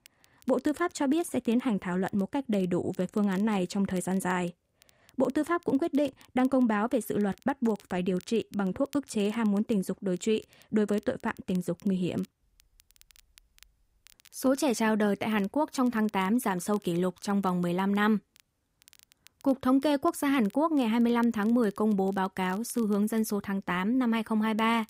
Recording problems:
crackle, like an old record; faint; 30 dB below the speech

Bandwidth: 15.5 kHz